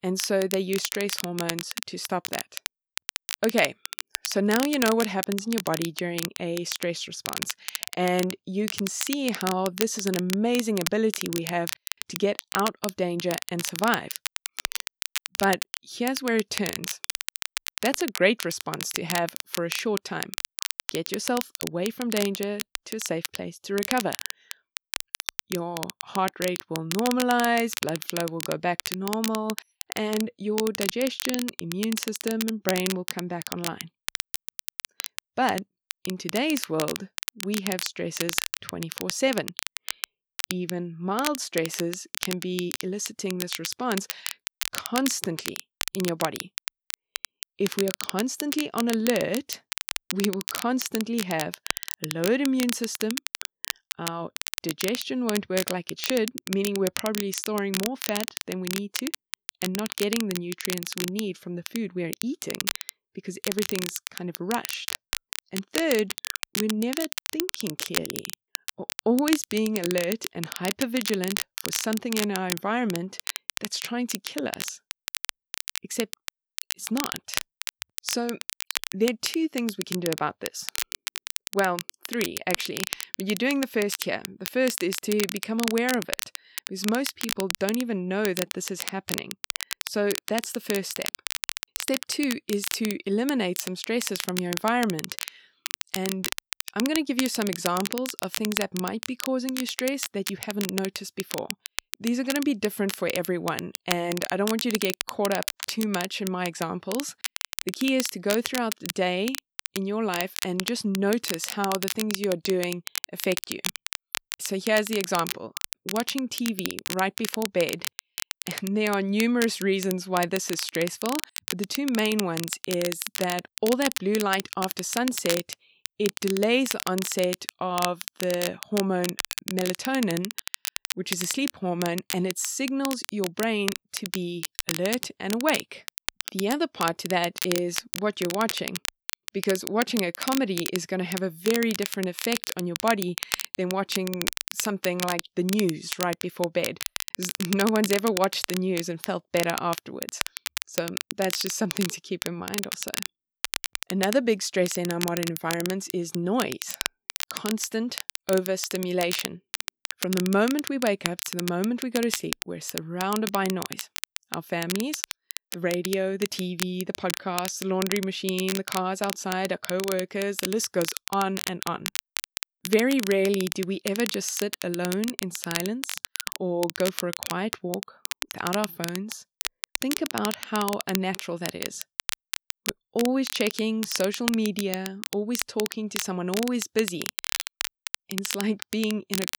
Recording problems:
crackle, like an old record; loud; 5 dB below the speech

